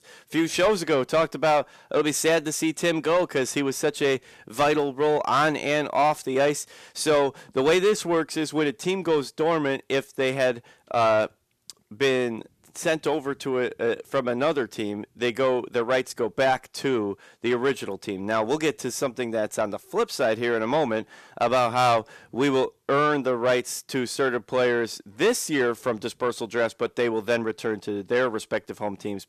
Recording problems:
distortion; slight; 10 dB below the speech

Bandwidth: 14 kHz